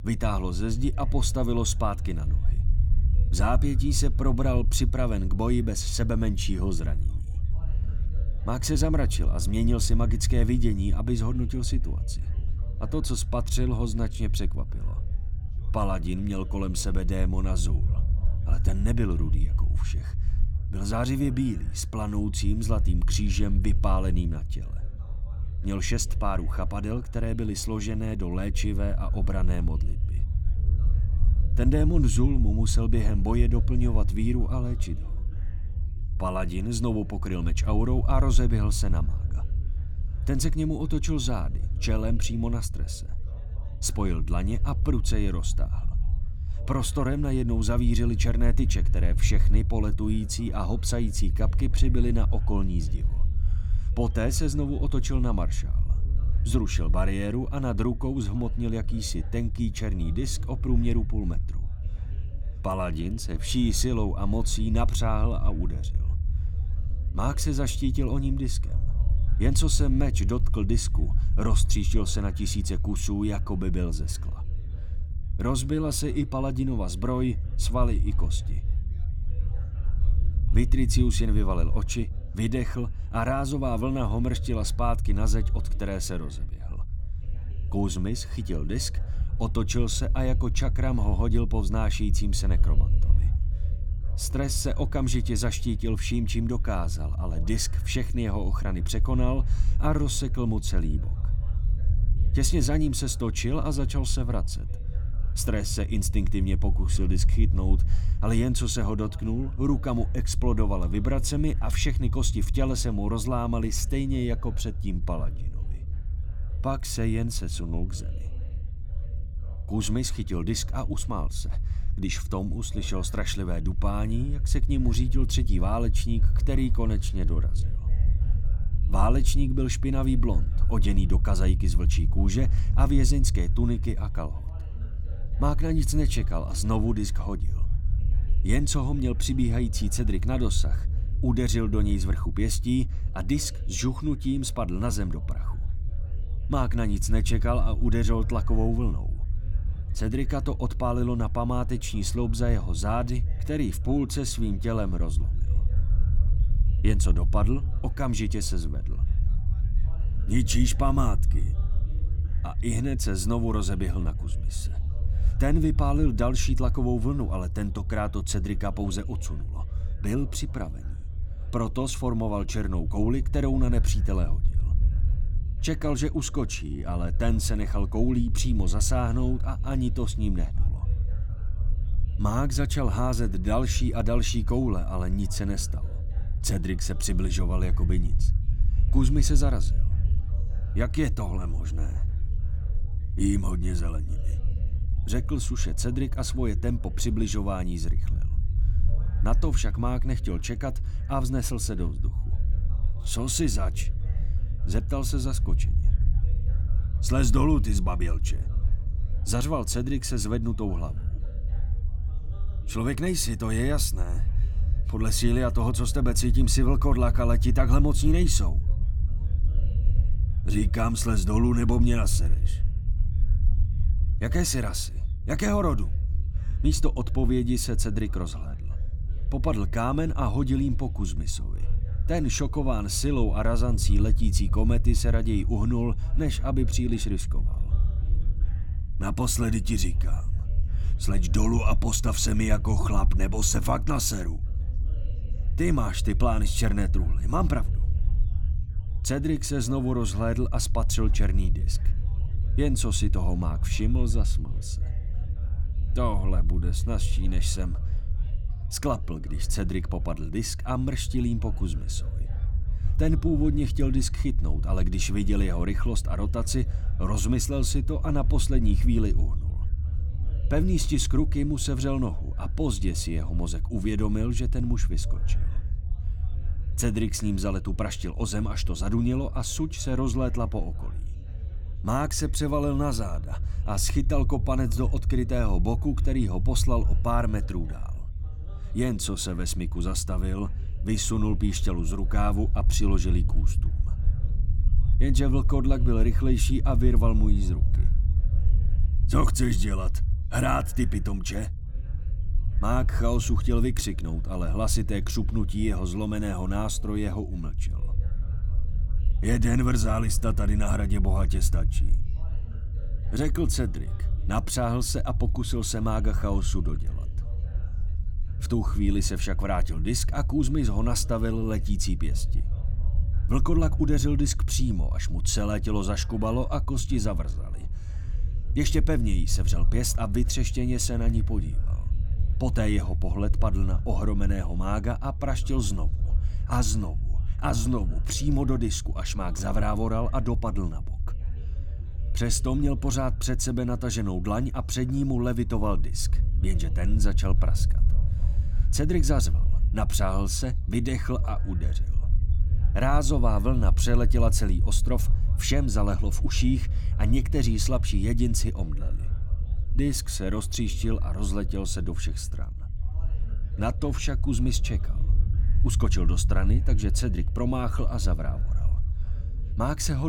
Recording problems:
low rumble; noticeable; throughout; 15 dB below the speech
background chatter; faint; throughout; 4 voices, 25 dB below the speech
abrupt cut into speech; at the end

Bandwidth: 17.5 kHz